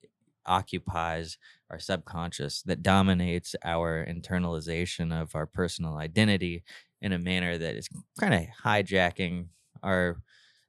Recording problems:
none

